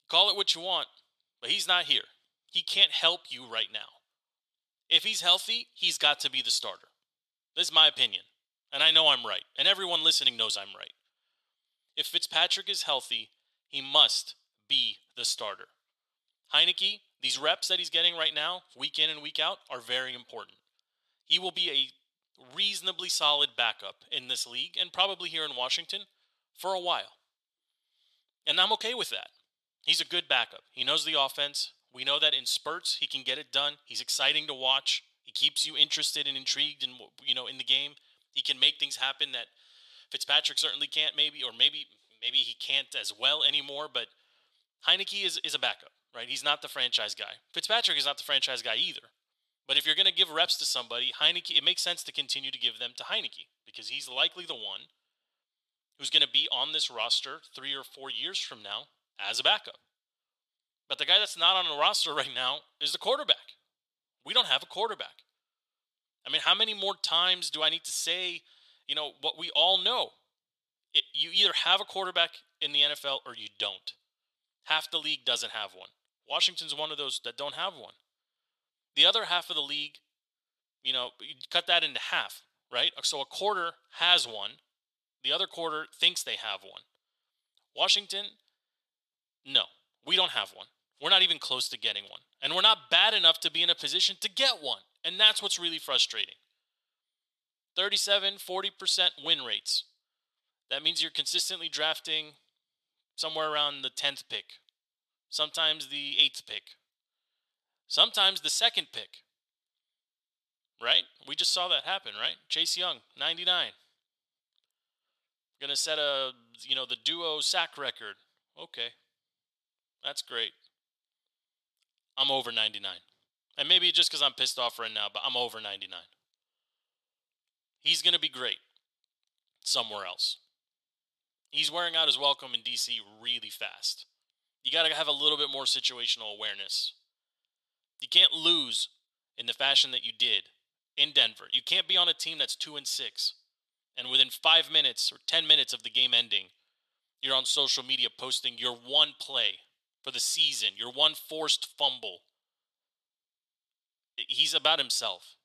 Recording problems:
thin; very; fading below 650 Hz

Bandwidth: 13.5 kHz